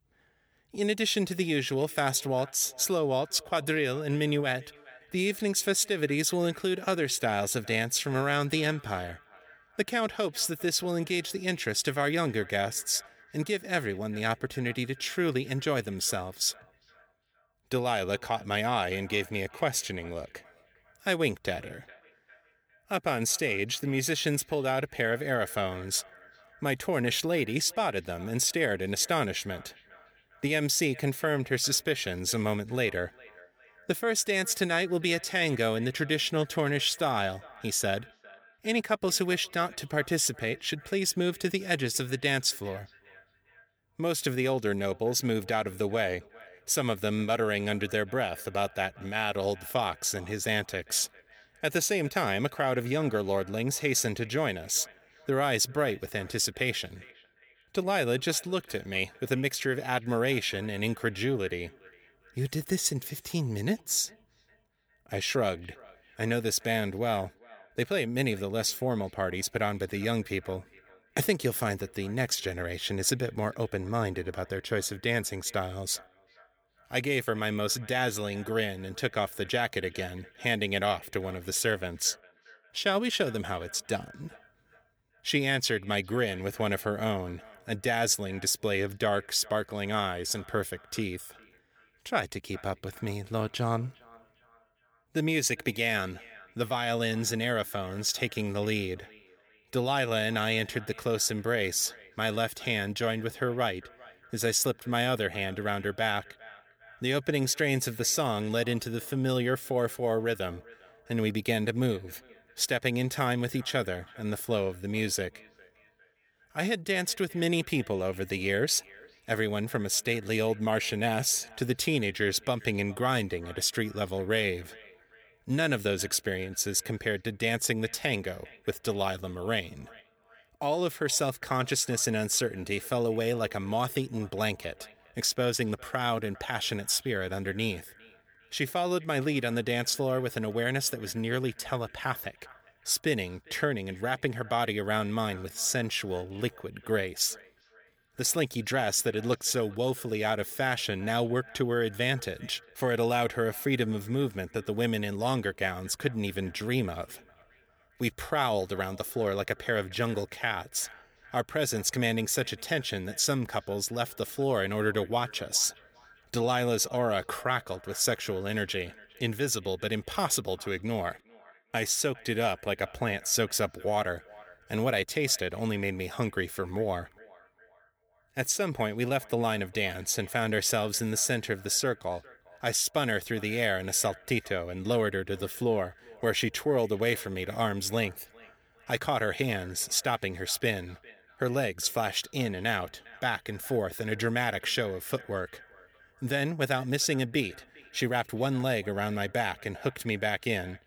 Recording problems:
echo of what is said; faint; throughout; 400 ms later, 25 dB below the speech

